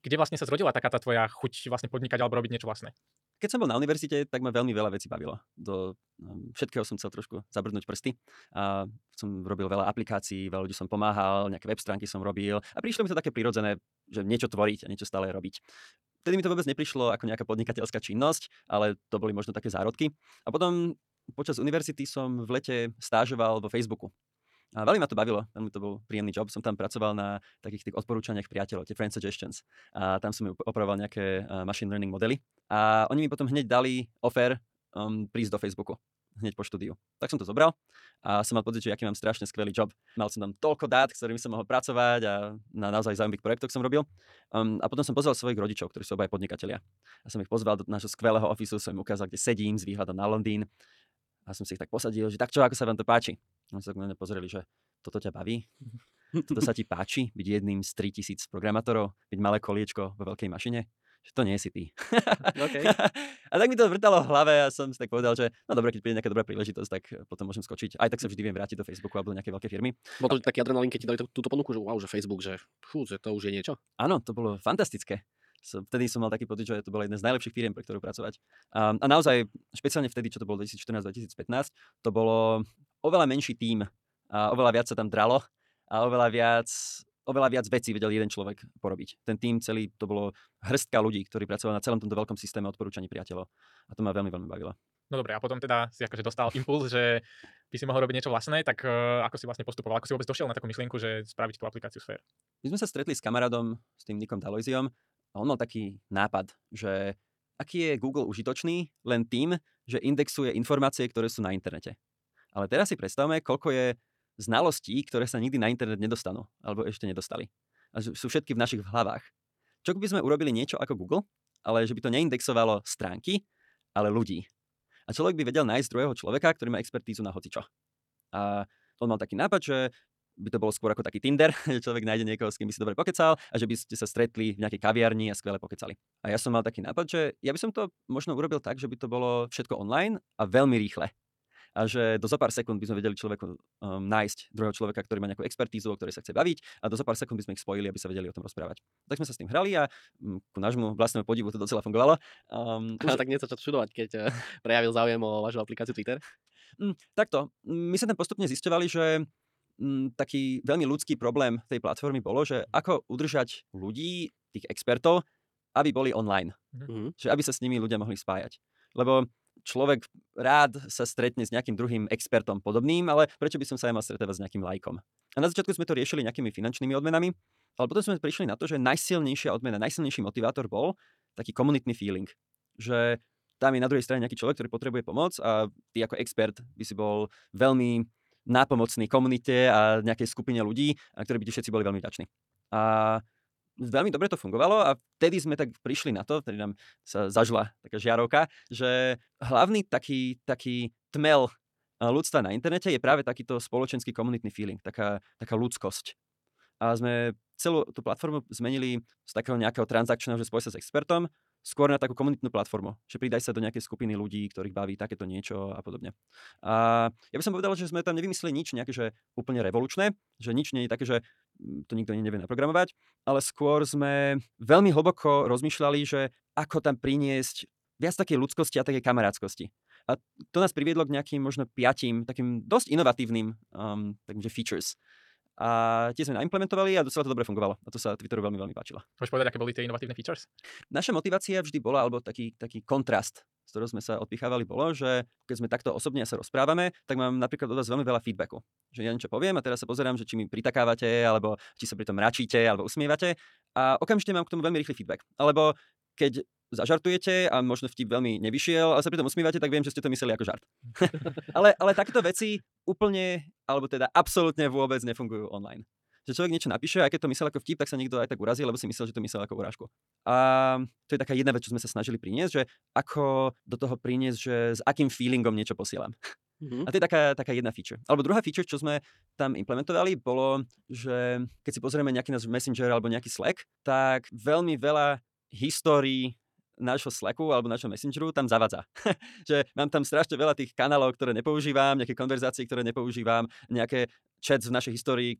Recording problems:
wrong speed, natural pitch; too fast; 1.5 times normal speed

